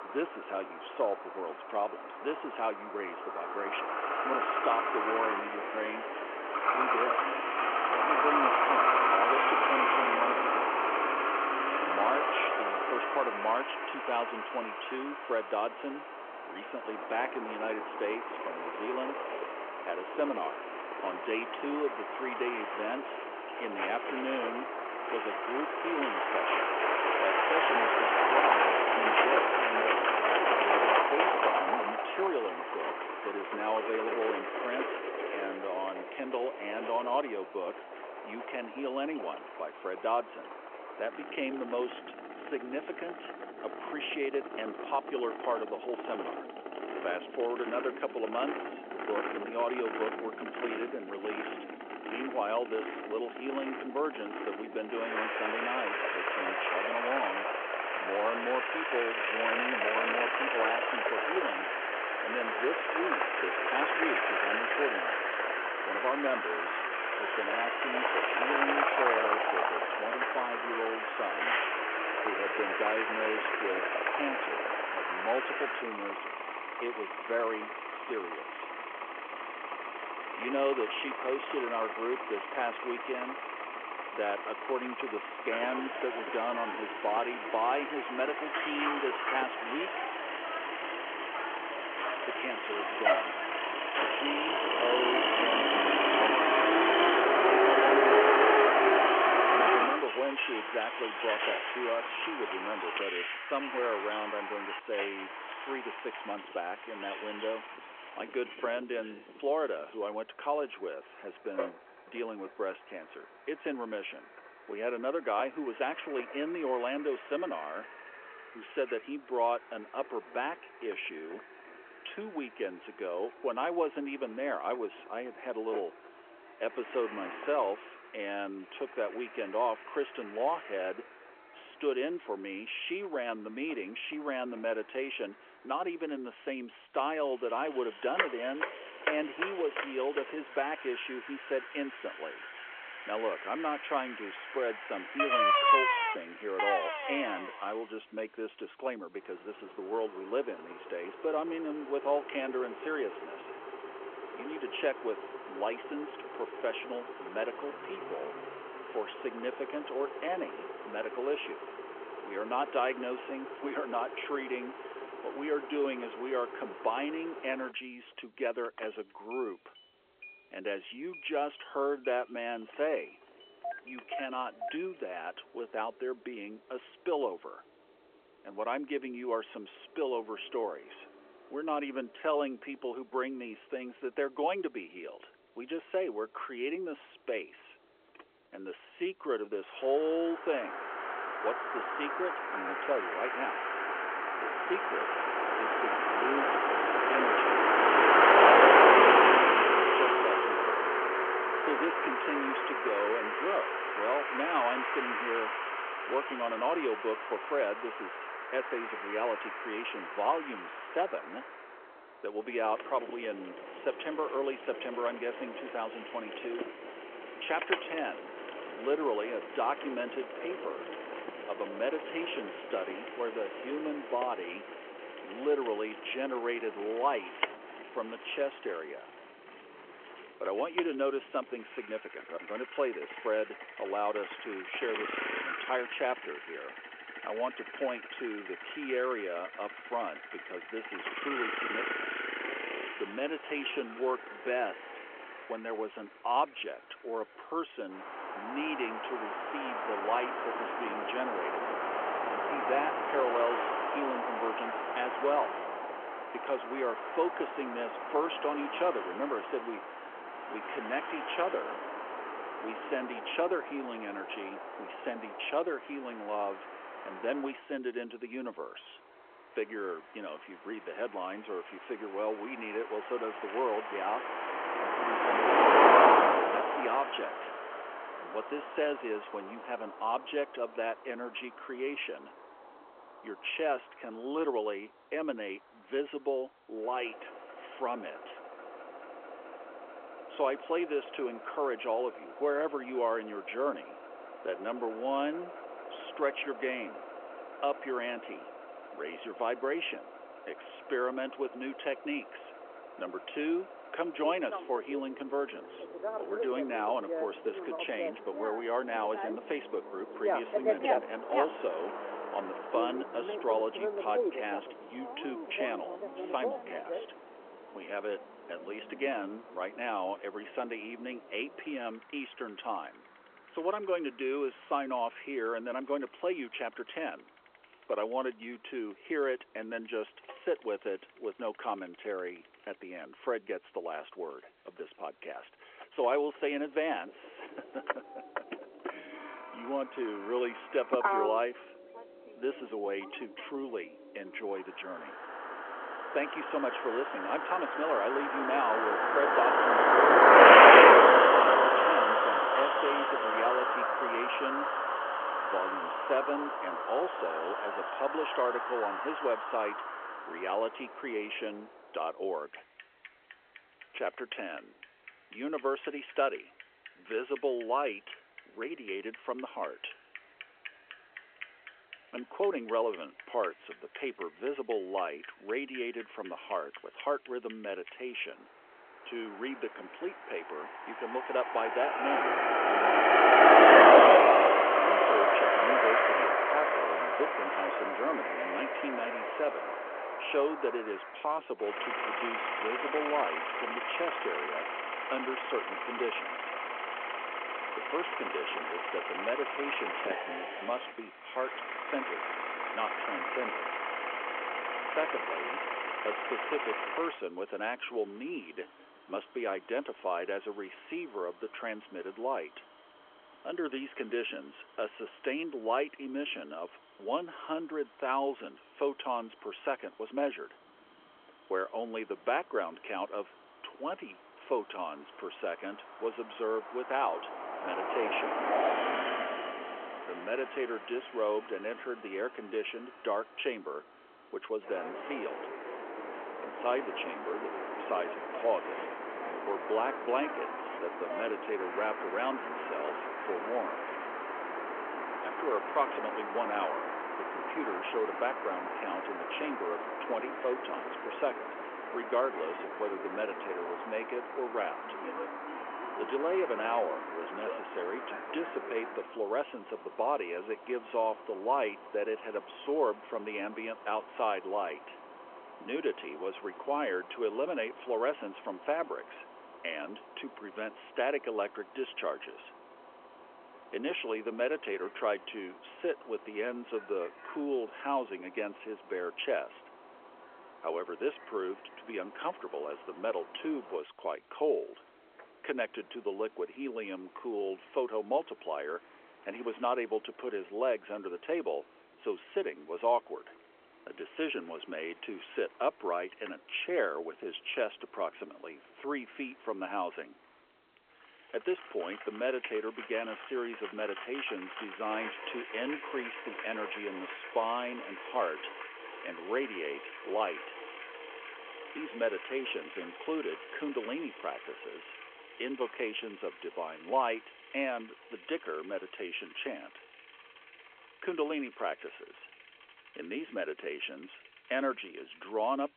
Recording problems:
phone-call audio
traffic noise; very loud; throughout; 6 dB above the speech

